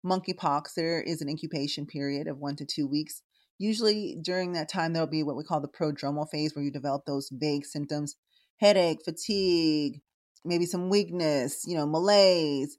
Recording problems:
none

